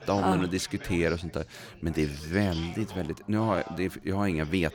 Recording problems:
background chatter; noticeable; throughout; 4 voices, 15 dB below the speech

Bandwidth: 18.5 kHz